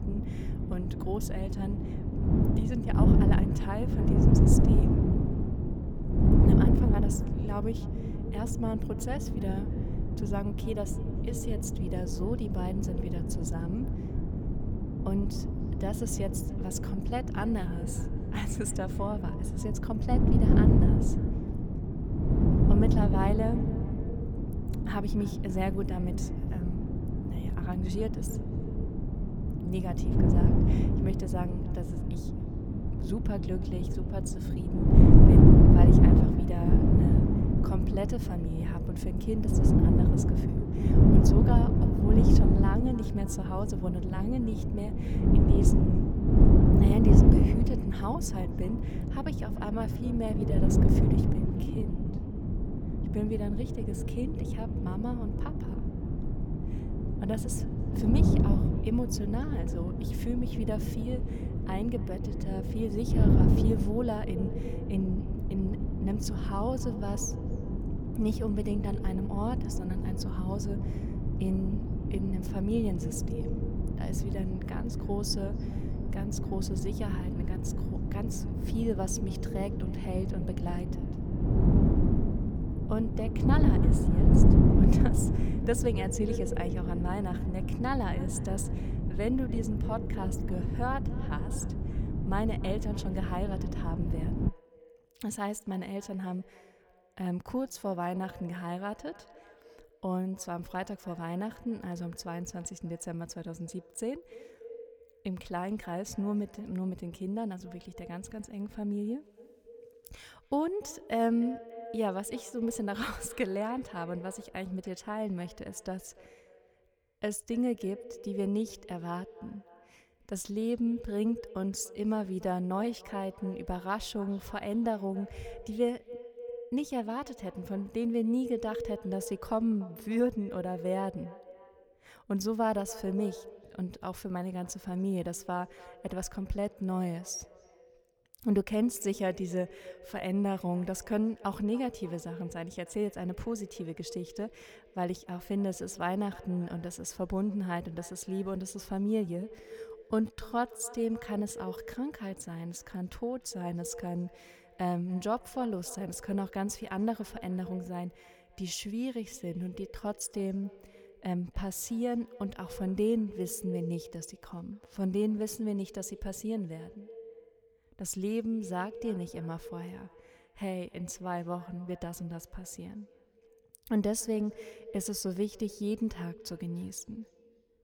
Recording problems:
echo of what is said; noticeable; throughout; 290 ms later, 15 dB below the speech
wind noise on the microphone; heavy; until 1:34; 1 dB above the speech
uneven, jittery; strongly; from 6 s to 2:40

